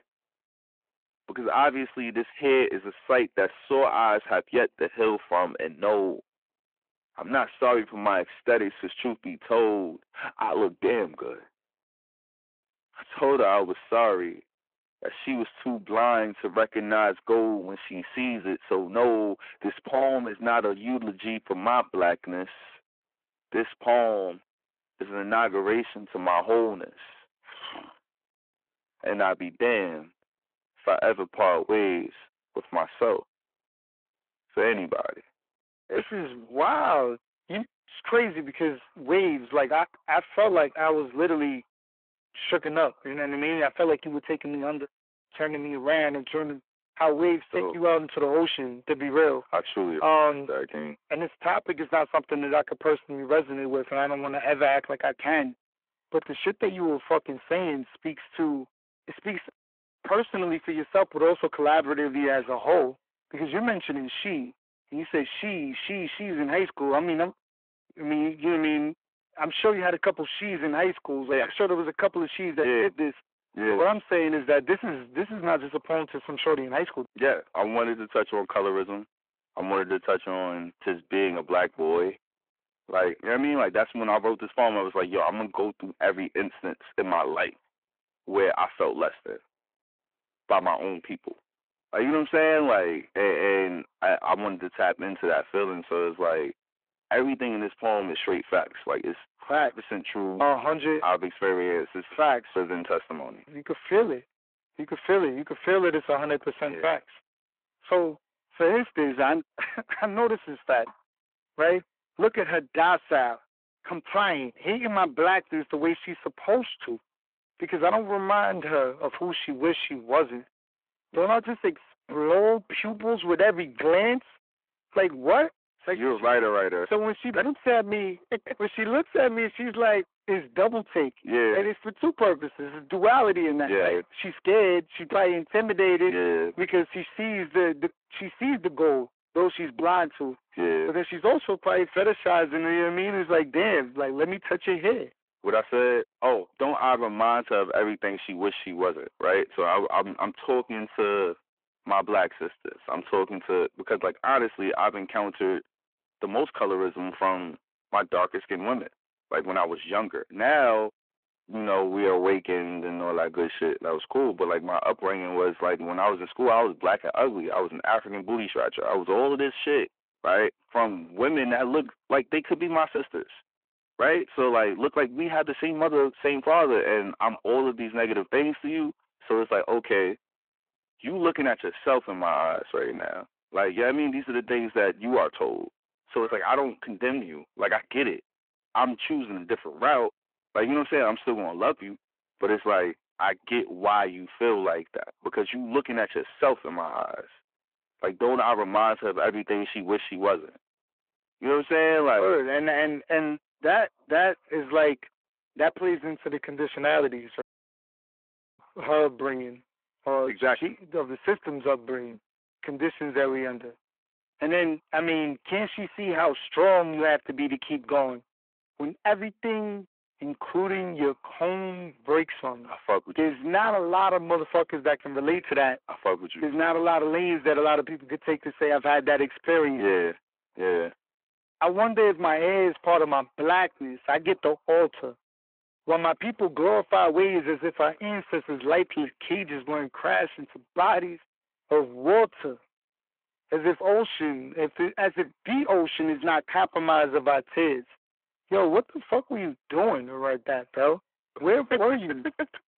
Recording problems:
phone-call audio
distortion; slight; 10 dB below the speech
audio cutting out; at 3:27 for 1 s

